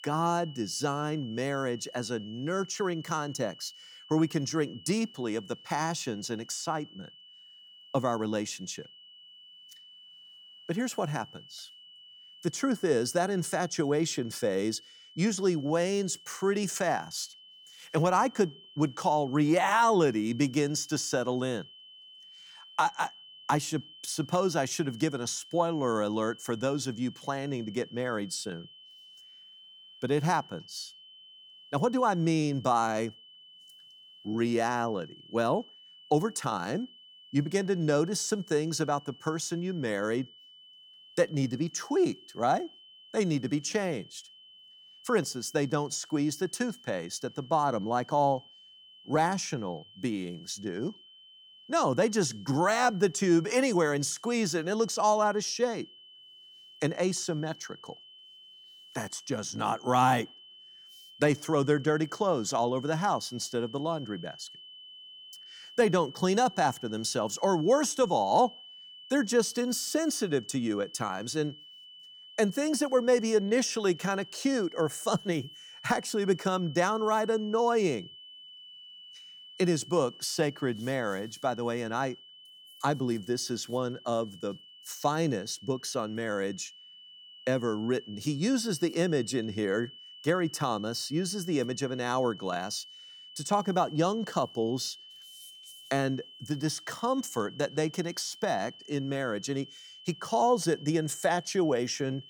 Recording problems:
high-pitched whine; noticeable; throughout; 3 kHz, 20 dB below the speech

